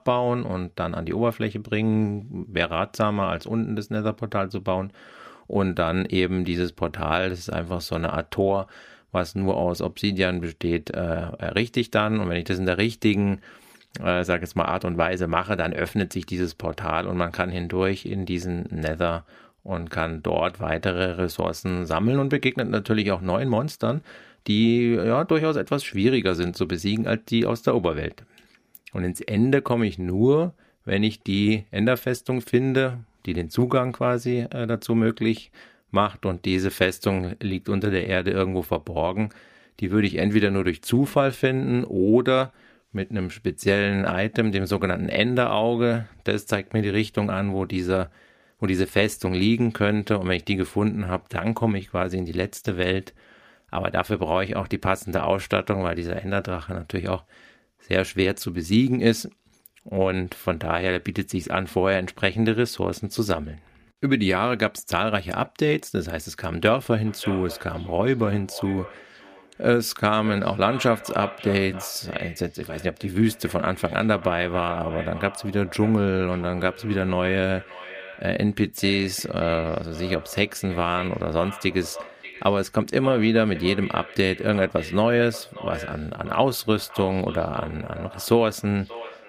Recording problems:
echo of what is said; noticeable; from 1:07 on; 580 ms later, 15 dB below the speech

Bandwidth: 15 kHz